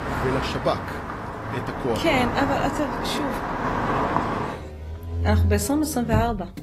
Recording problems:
garbled, watery; slightly; nothing above 13.5 kHz
traffic noise; loud; throughout; 2 dB below the speech

